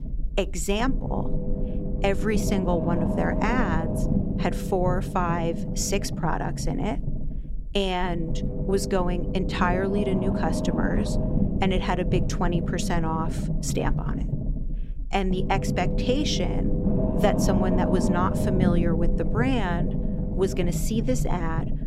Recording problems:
low rumble; loud; throughout; 5 dB below the speech

